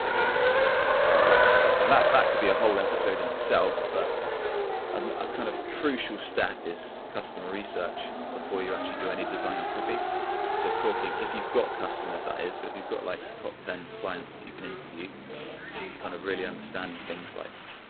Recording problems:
phone-call audio; poor line; nothing above 4 kHz
traffic noise; very loud; throughout; 5 dB above the speech

